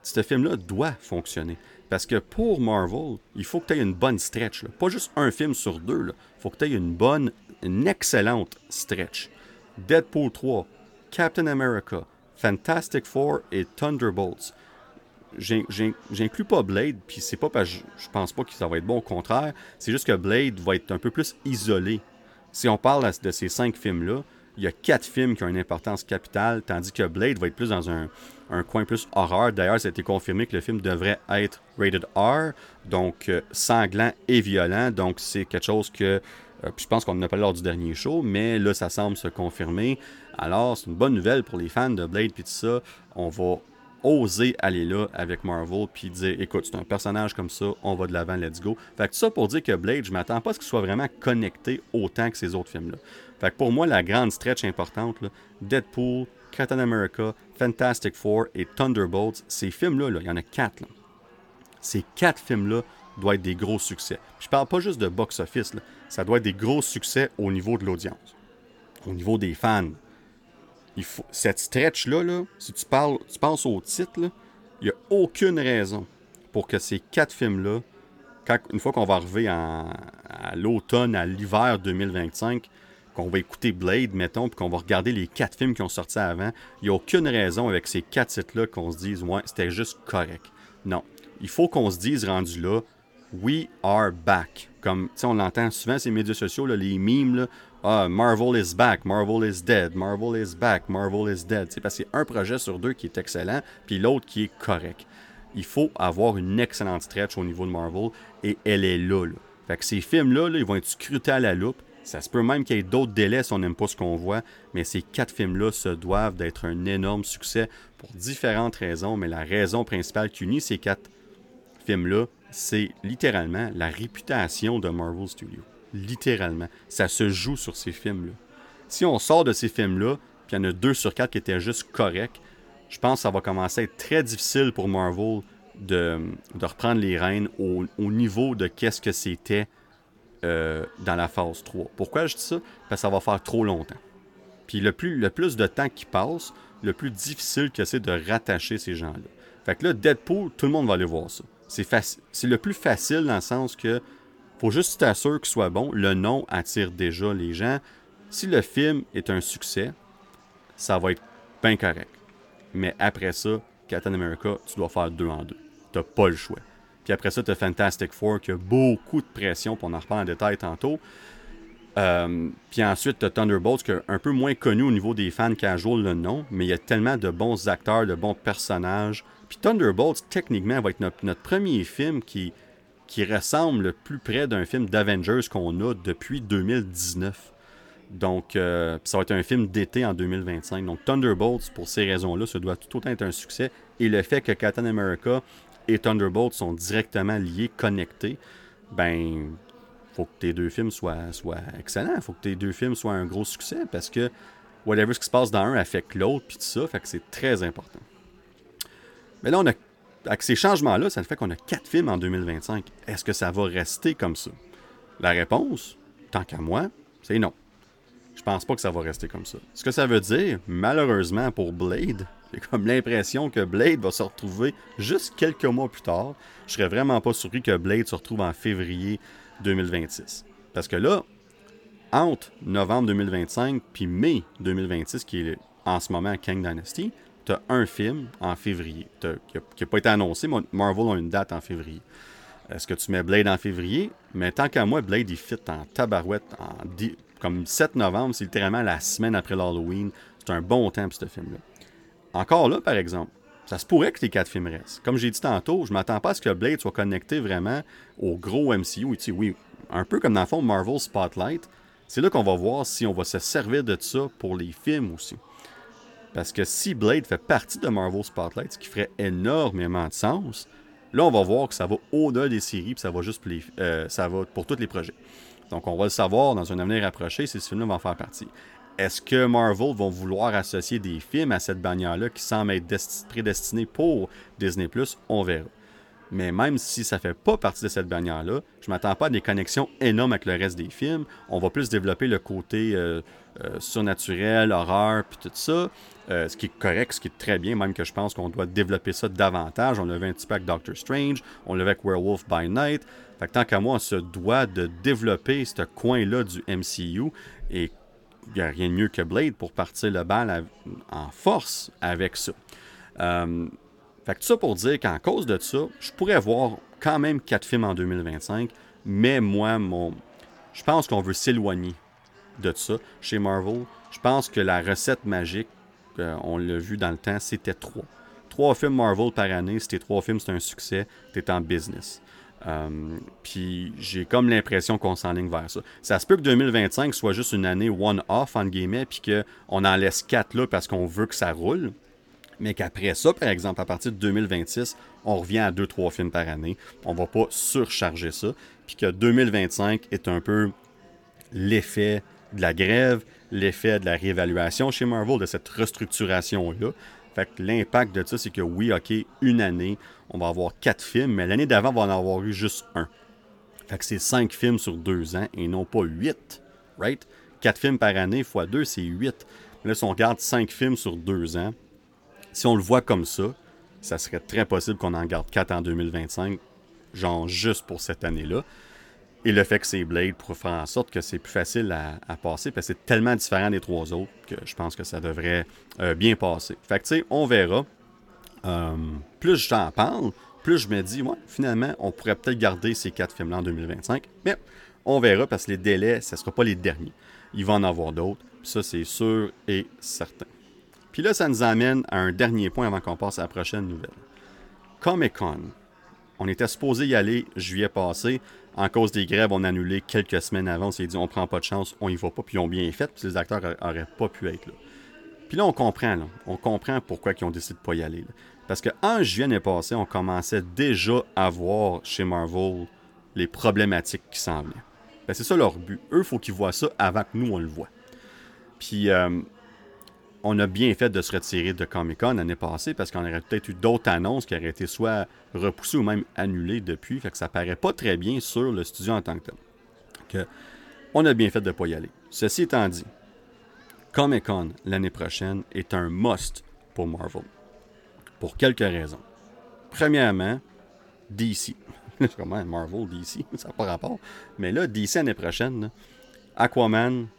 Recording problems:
chatter from many people; faint; throughout; 30 dB below the speech

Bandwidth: 17.5 kHz